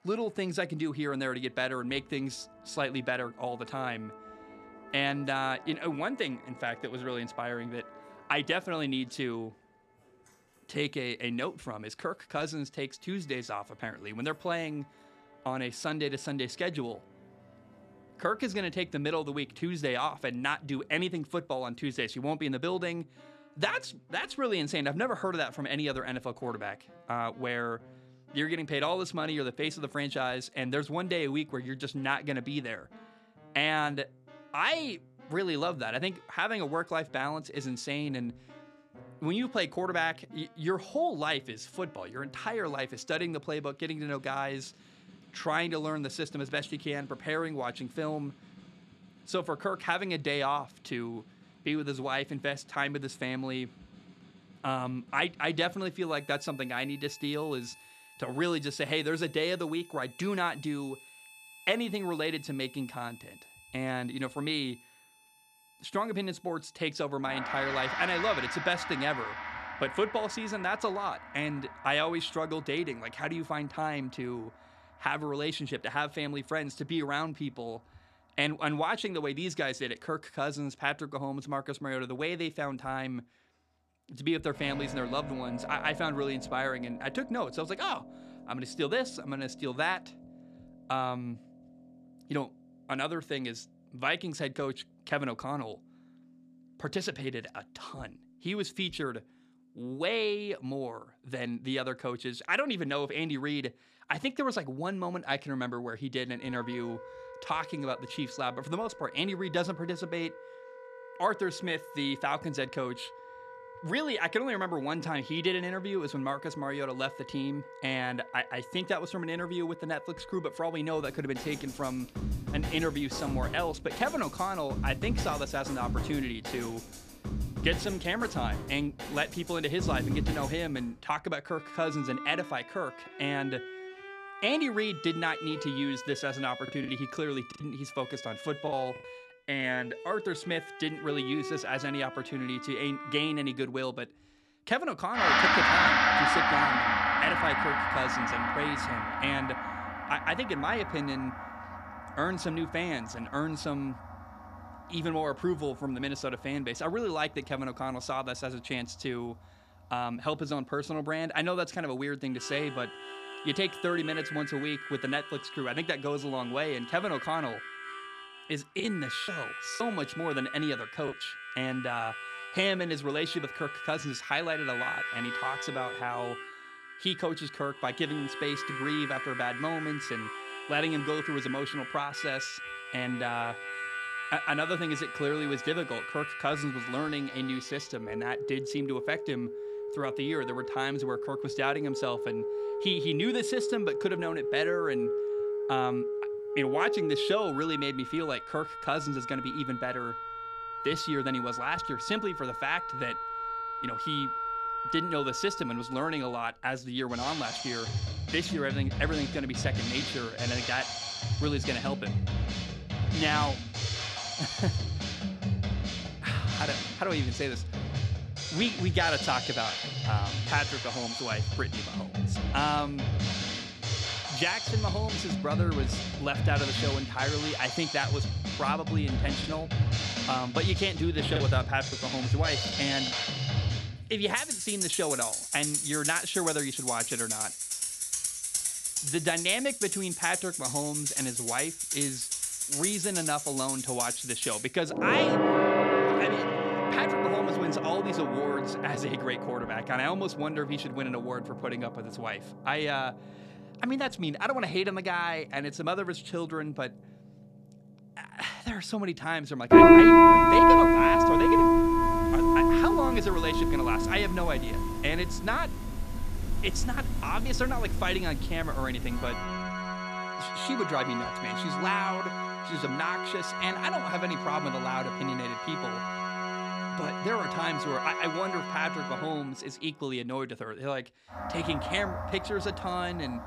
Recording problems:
background music; very loud; throughout; 3 dB above the speech
choppy; very; from 2:17 to 2:19, from 2:49 to 2:51 and from 3:49 to 3:53; 6% of the speech affected

